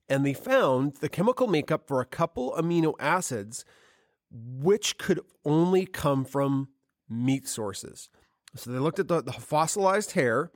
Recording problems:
none

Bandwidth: 17 kHz